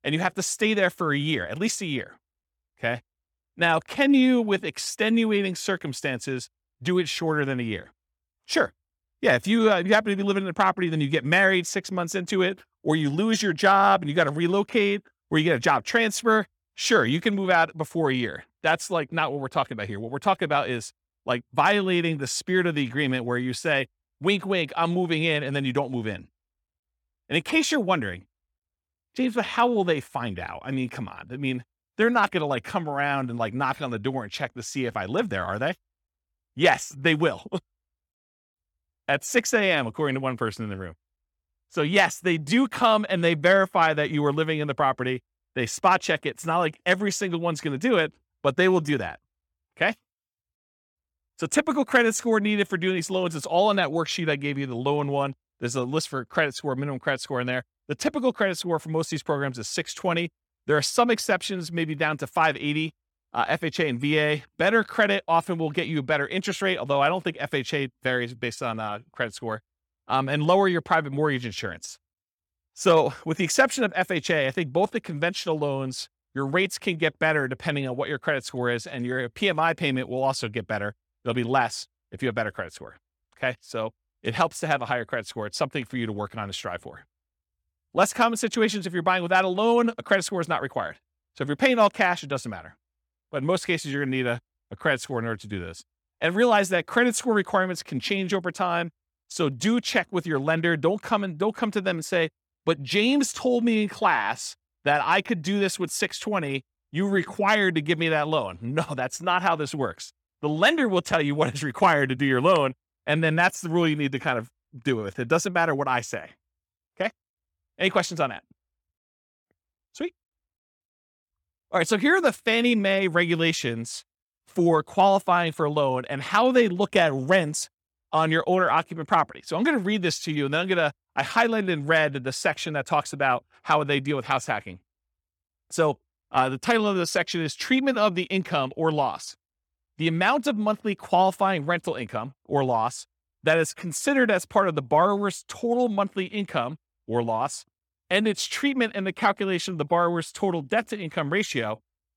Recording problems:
none

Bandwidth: 18 kHz